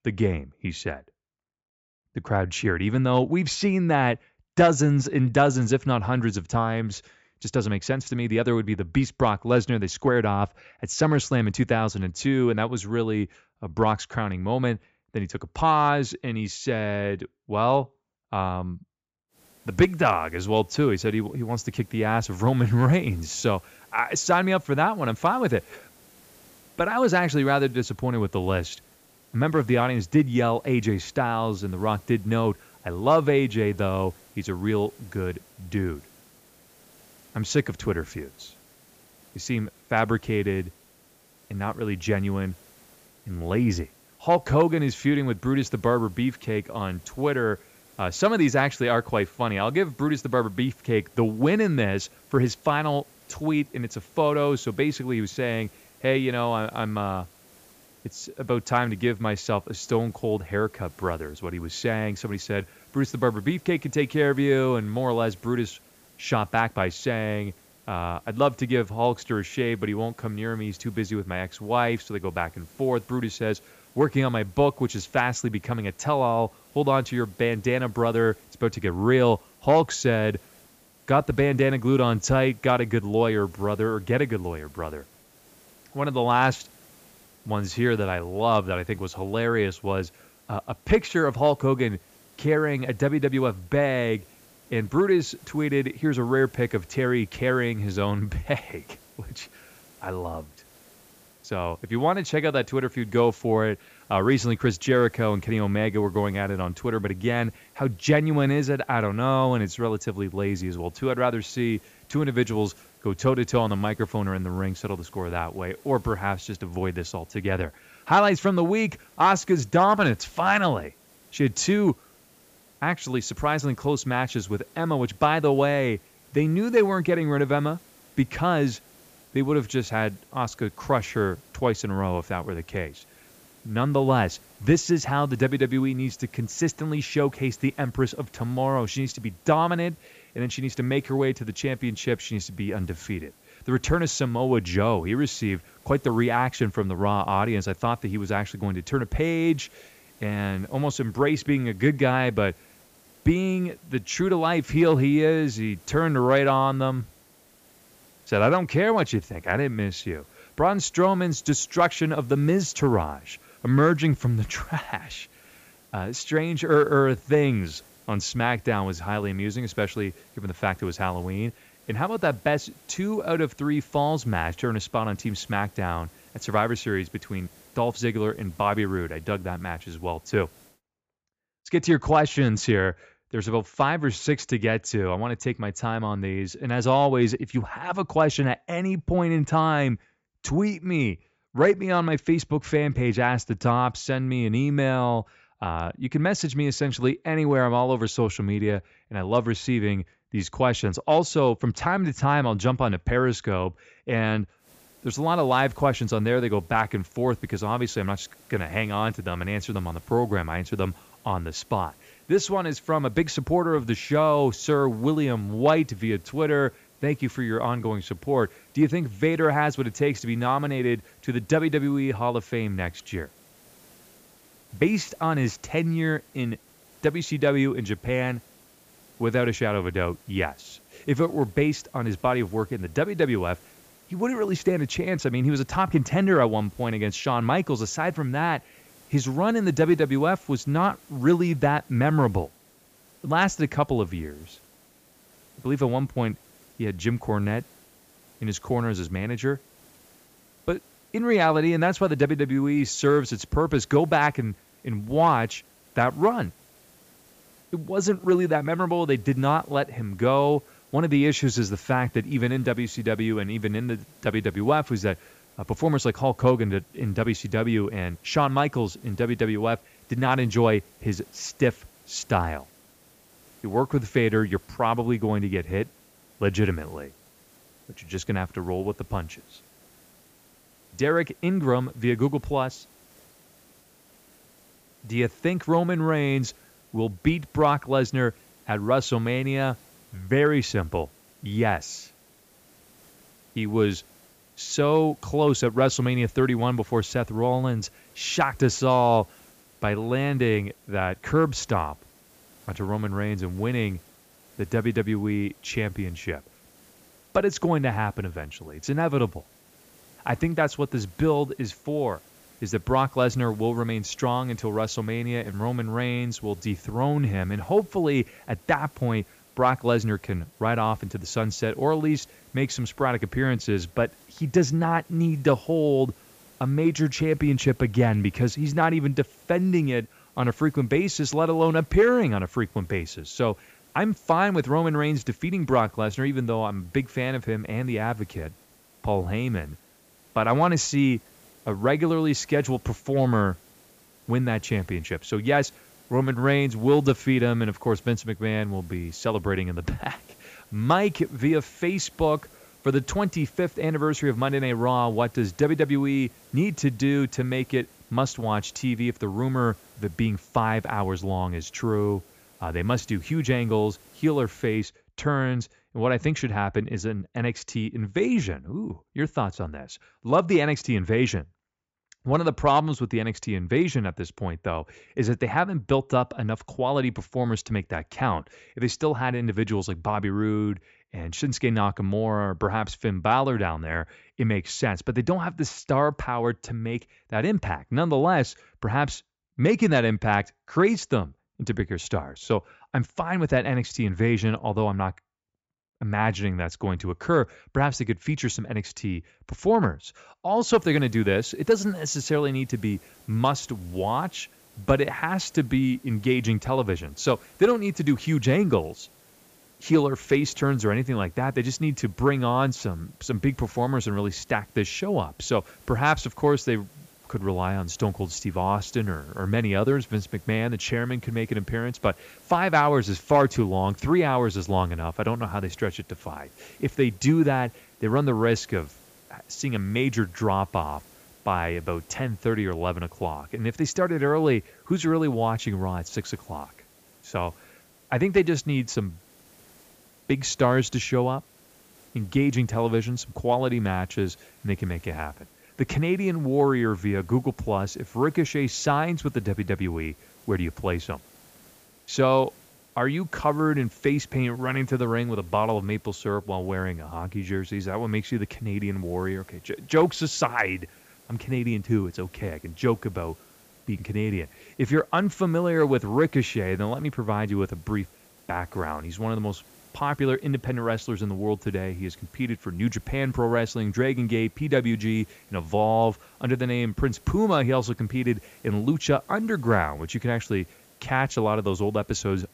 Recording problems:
high frequencies cut off; noticeable; nothing above 8 kHz
hiss; faint; from 19 s to 3:01, from 3:25 to 6:05 and from 6:41 on; 30 dB below the speech

